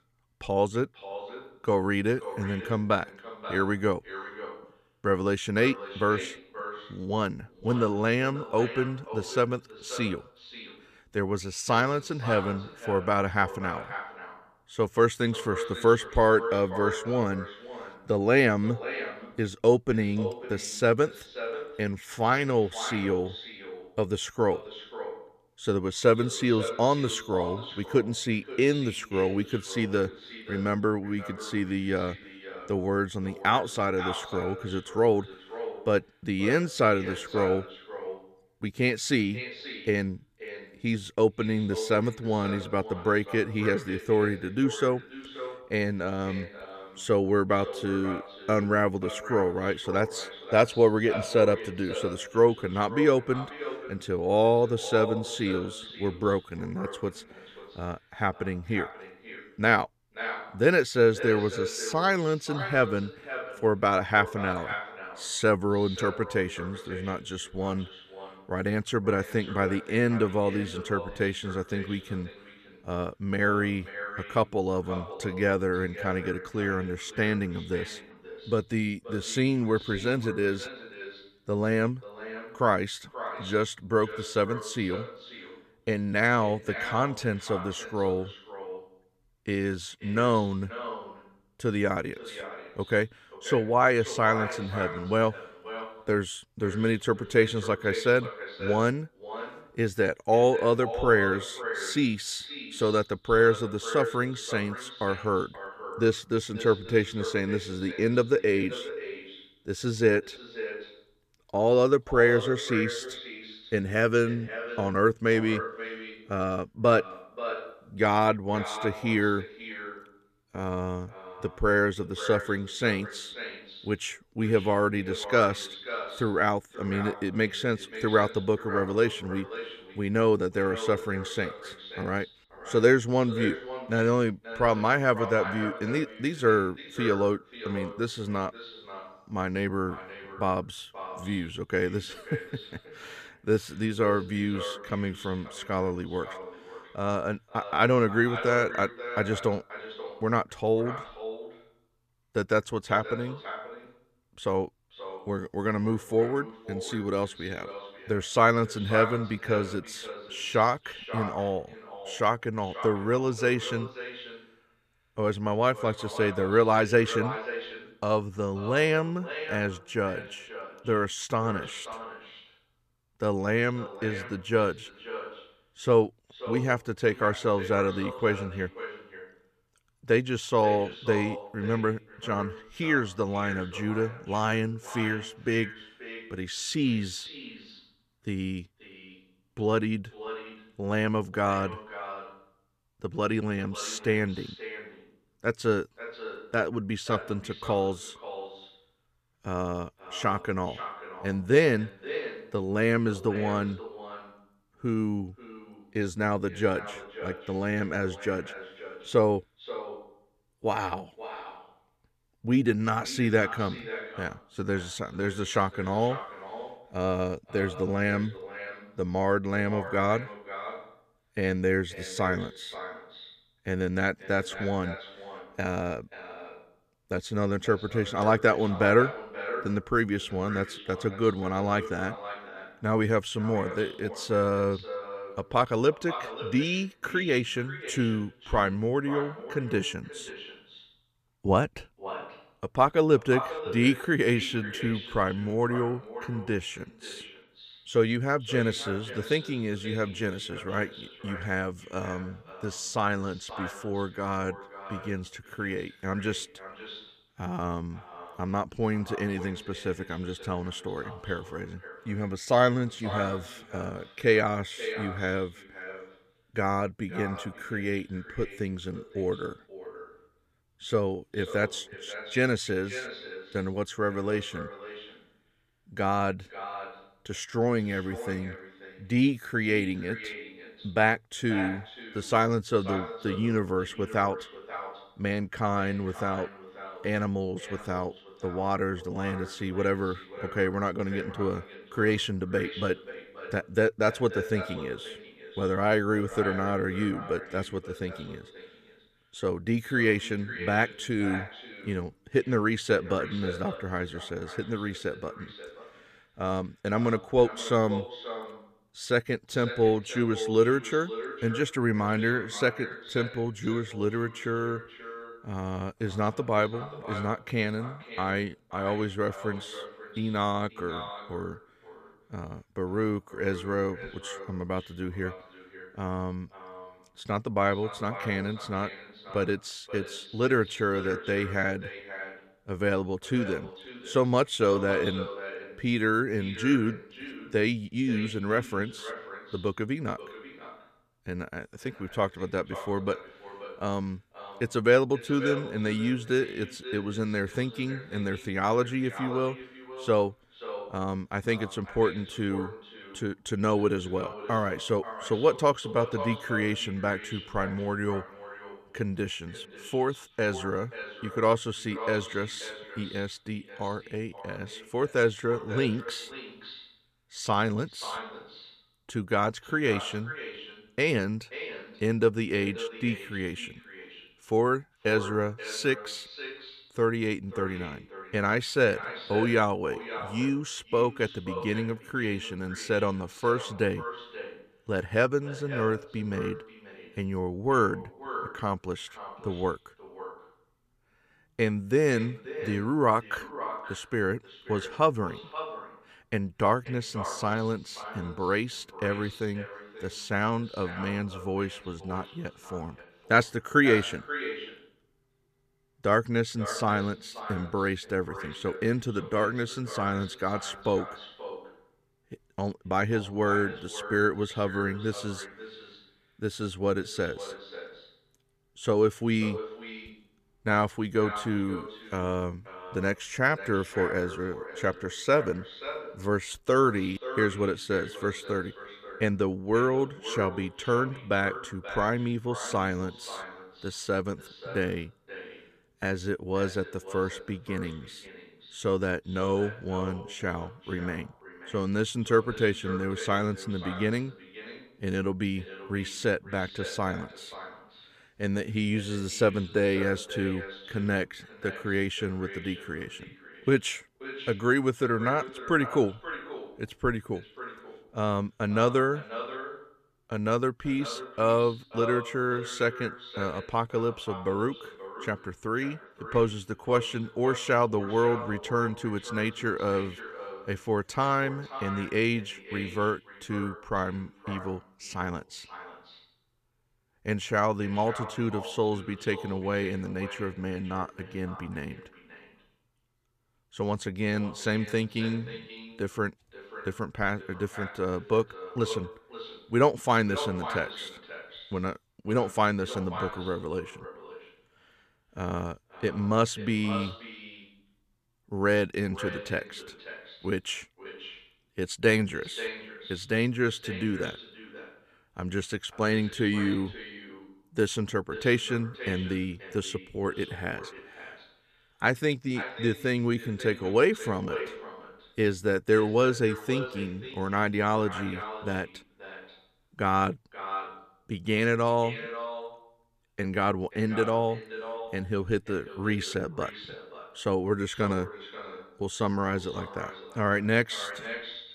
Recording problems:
echo of what is said; noticeable; throughout; 530 ms later, 10 dB below the speech

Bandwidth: 14.5 kHz